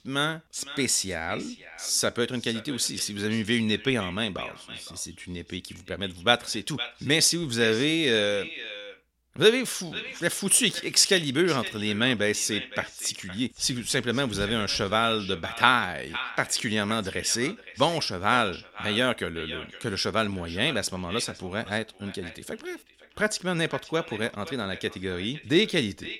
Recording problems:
echo of what is said; noticeable; throughout; 510 ms later, 15 dB below the speech

